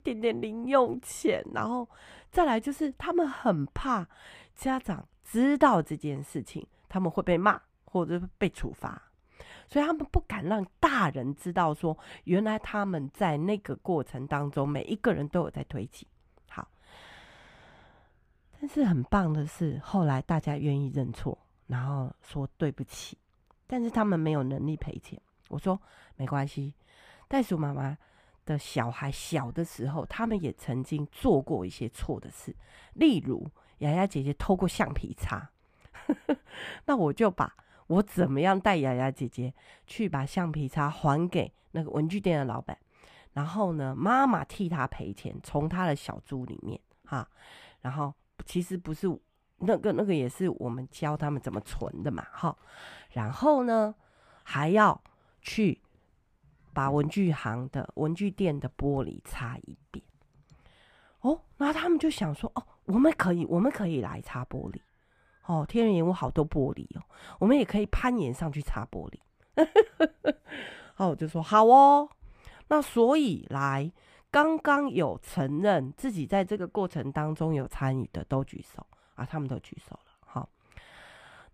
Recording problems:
muffled; slightly; fading above 3 kHz

